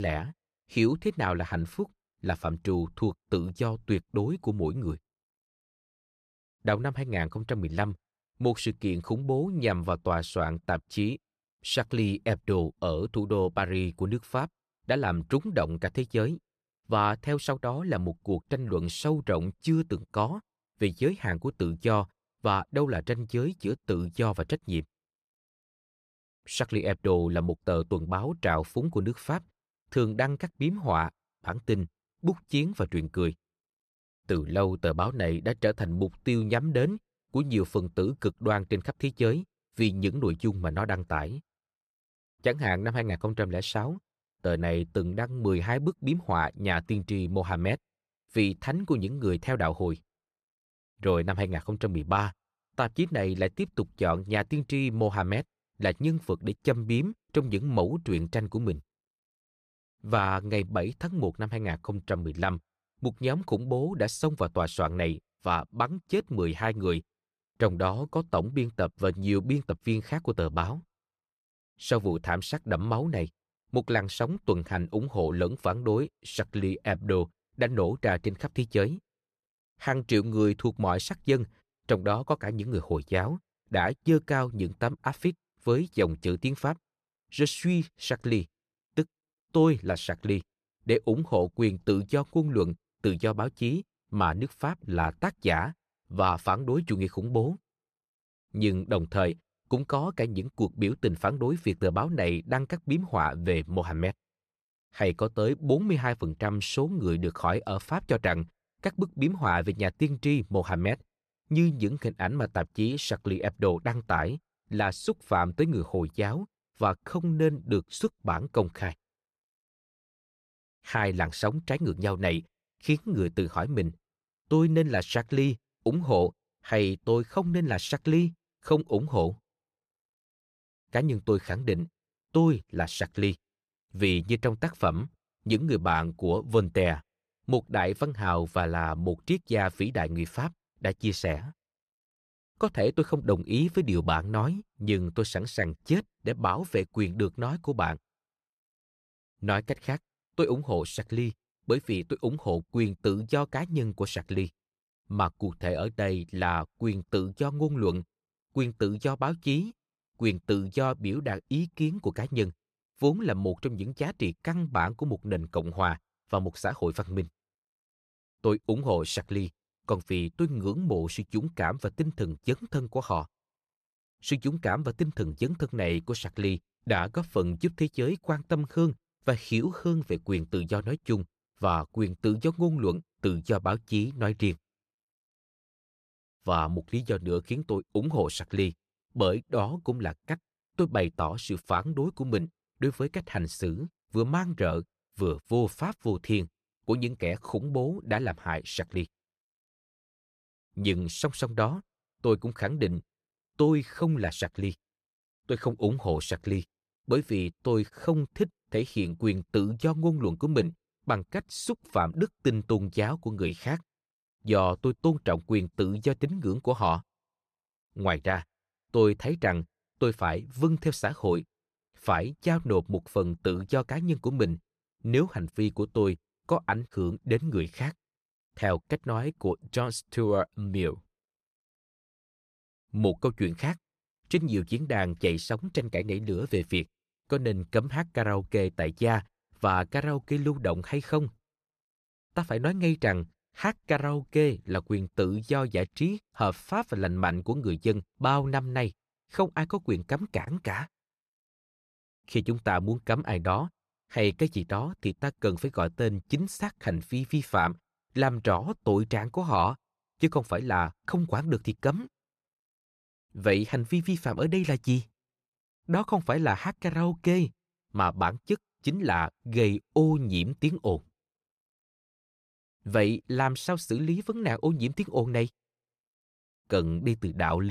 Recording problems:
abrupt cut into speech; at the start and the end

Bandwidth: 14.5 kHz